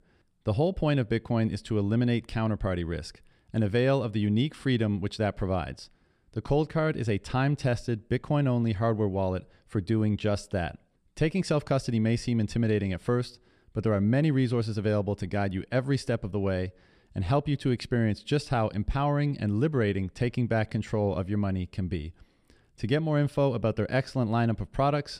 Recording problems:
none

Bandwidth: 14.5 kHz